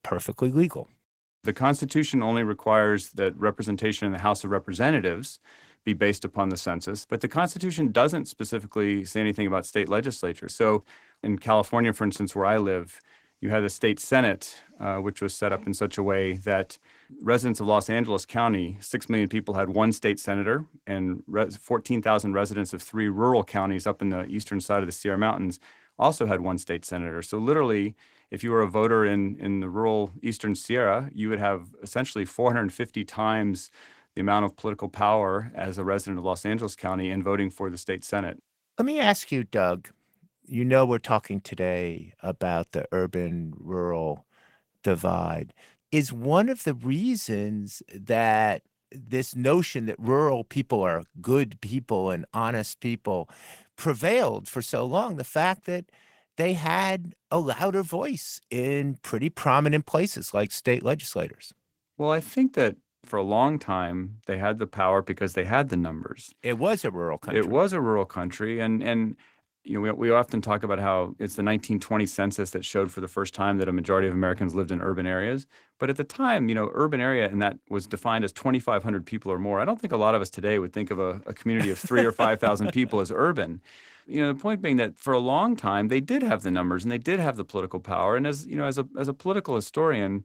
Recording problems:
garbled, watery; slightly; nothing above 16.5 kHz

